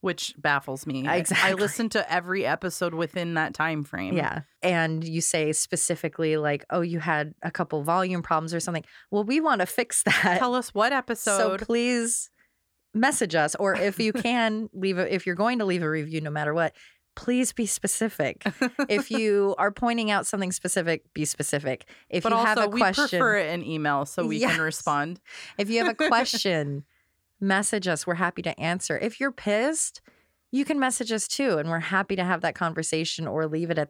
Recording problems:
none

